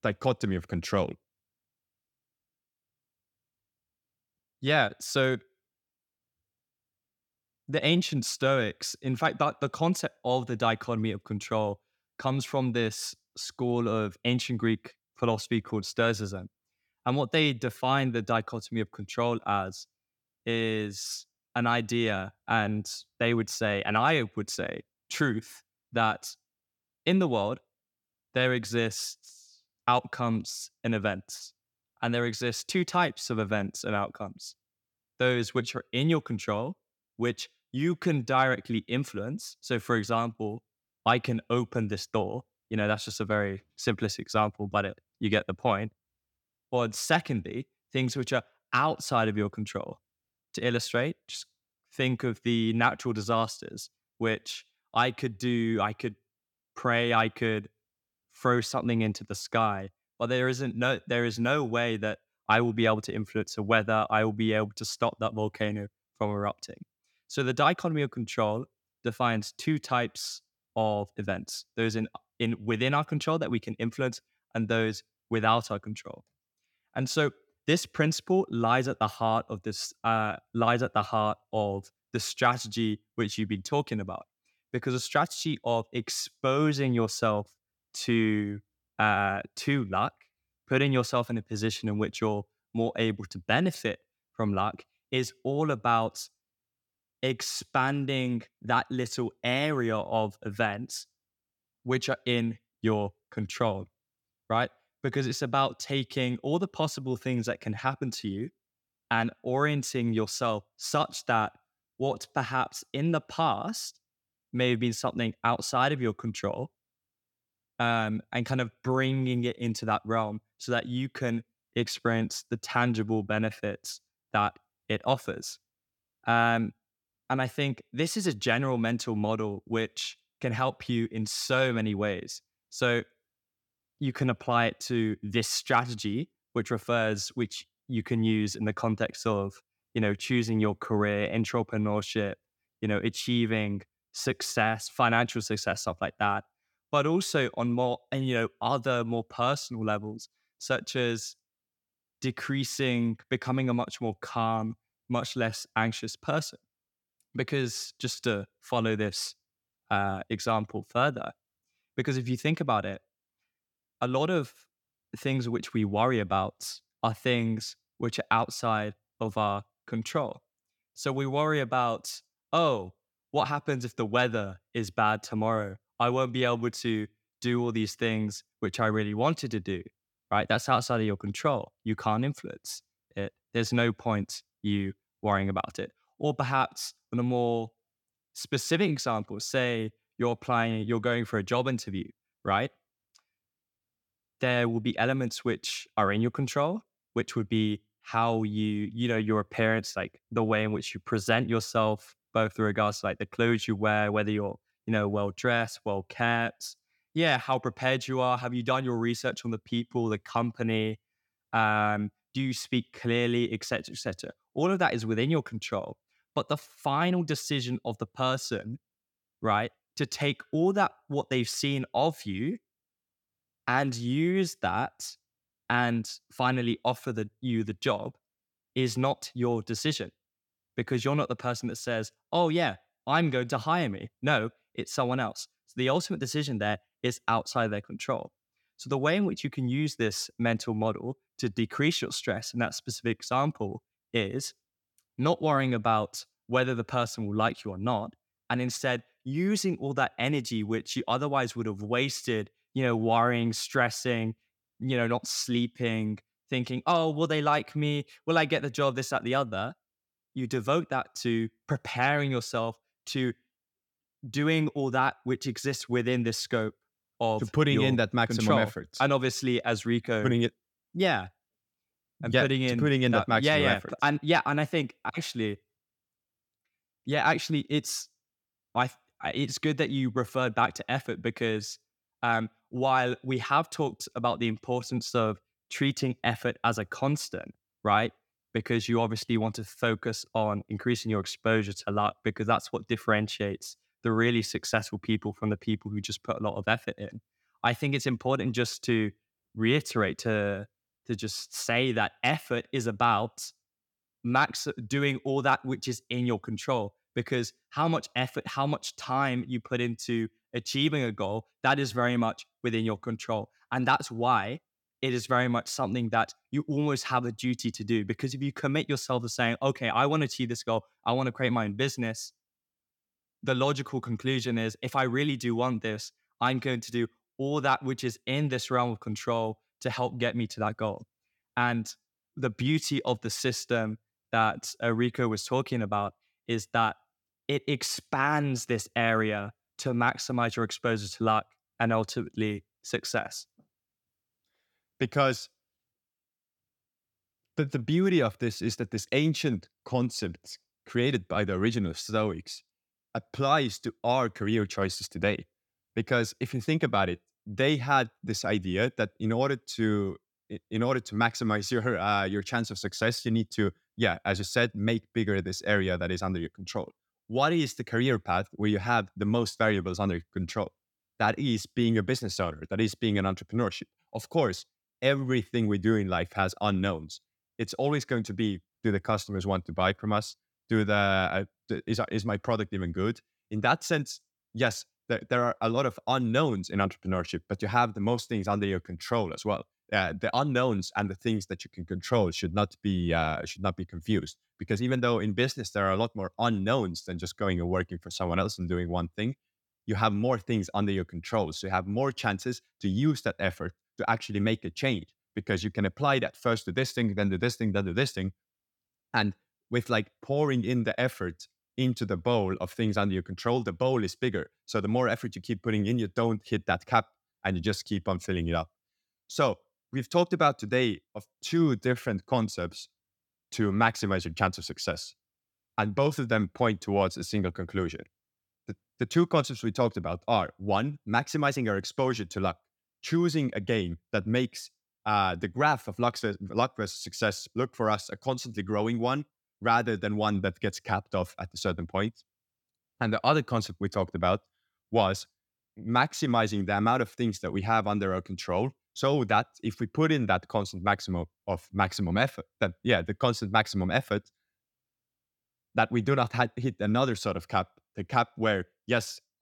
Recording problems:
none

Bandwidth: 18 kHz